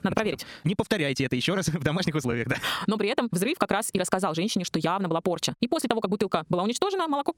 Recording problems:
wrong speed, natural pitch; too fast; 1.8 times normal speed
squashed, flat; somewhat

